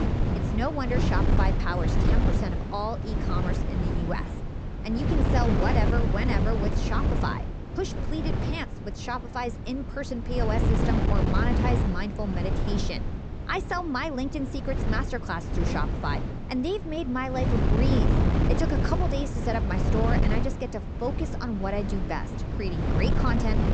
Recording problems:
high frequencies cut off; noticeable; nothing above 8 kHz
wind noise on the microphone; heavy; 2 dB below the speech

